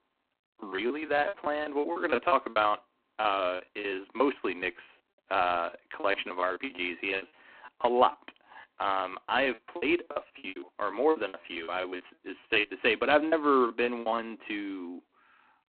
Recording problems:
phone-call audio; poor line
choppy; very; 19% of the speech affected

